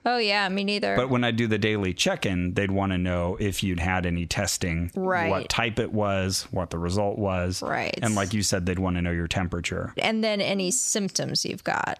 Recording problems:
squashed, flat; heavily

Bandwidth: 14 kHz